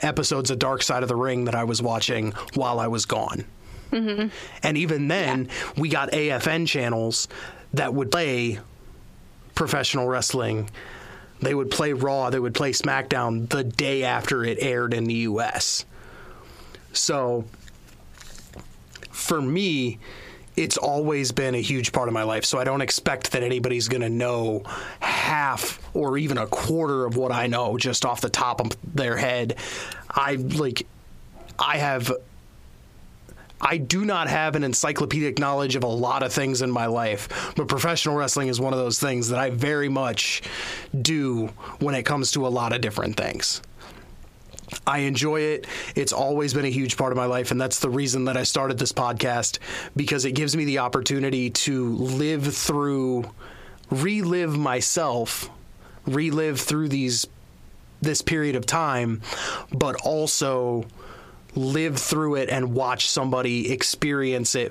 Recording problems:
squashed, flat; heavily

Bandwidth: 15 kHz